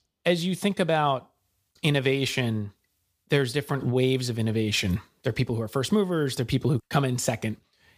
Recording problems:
none

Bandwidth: 15 kHz